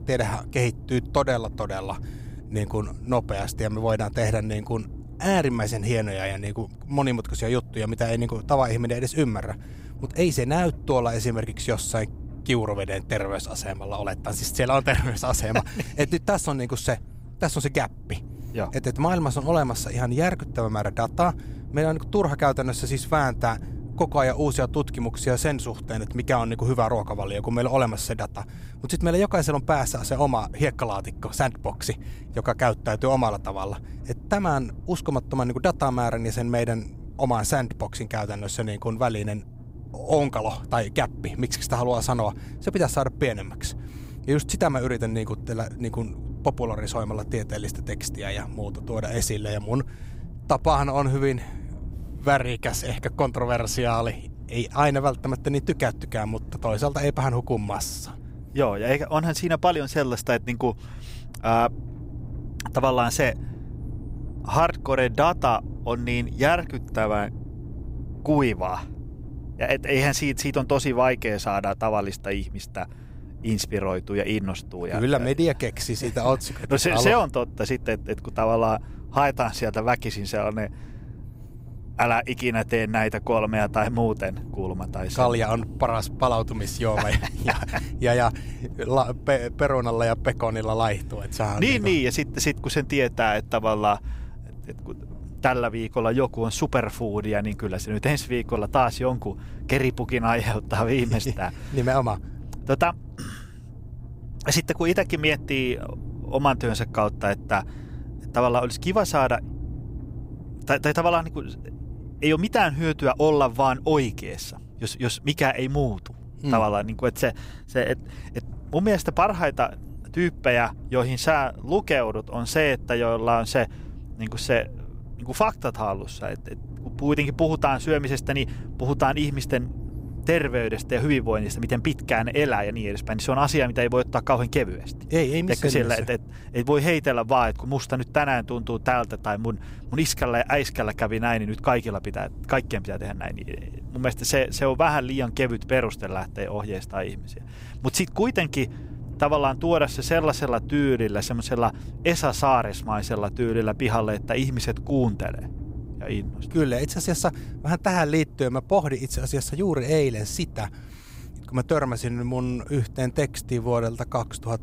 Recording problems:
low rumble; faint; throughout; 25 dB below the speech

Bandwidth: 15.5 kHz